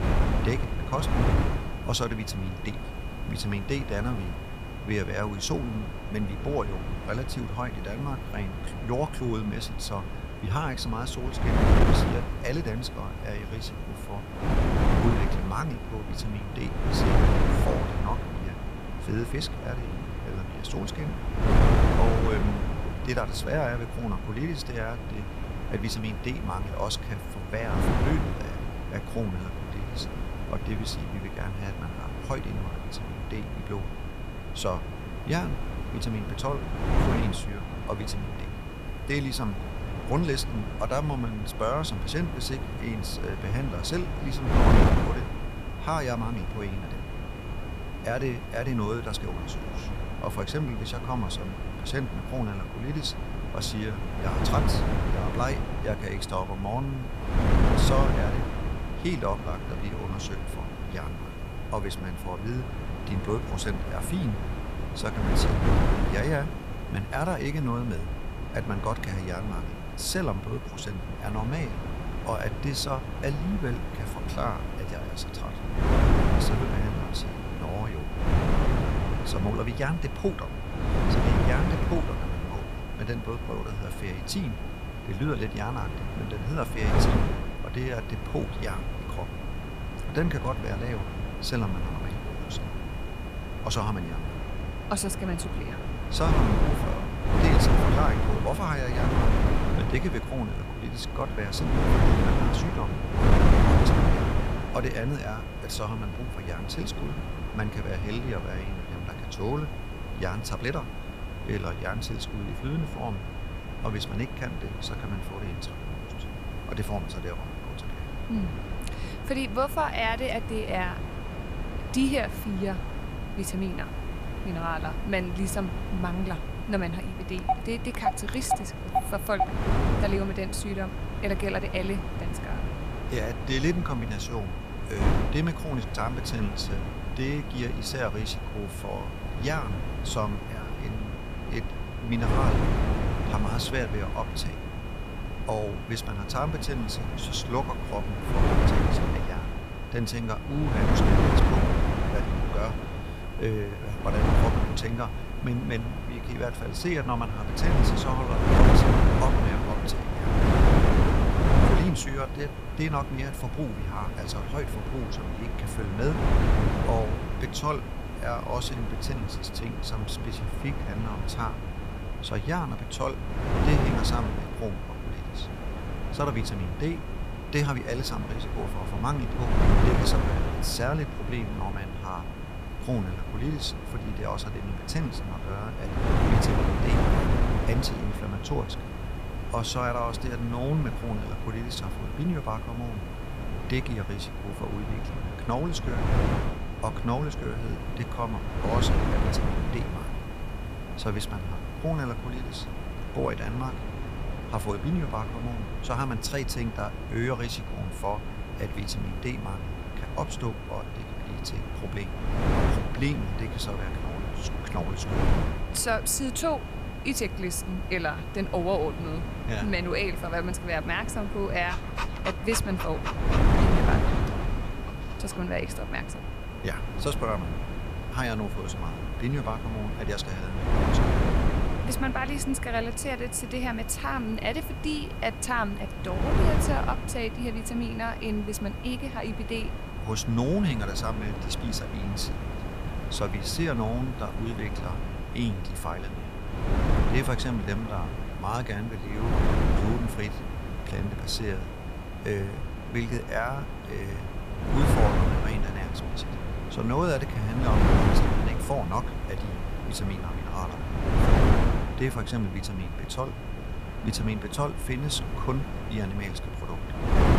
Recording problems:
wind noise on the microphone; heavy; 2 dB below the speech
high-pitched whine; noticeable; throughout; 2.5 kHz, 15 dB below the speech
chatter from many people; faint; throughout; 30 dB below the speech
hiss; faint; throughout; 30 dB below the speech
phone ringing; loud; from 2:07 to 2:09; peak 2 dB above the speech
dog barking; faint; at 2:40; peak 15 dB below the speech
dog barking; noticeable; from 3:42 to 3:45; peak level with the speech

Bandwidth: 14.5 kHz